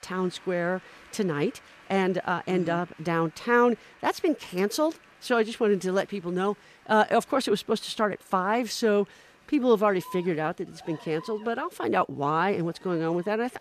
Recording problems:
crowd noise; faint; throughout; 25 dB below the speech

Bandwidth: 14.5 kHz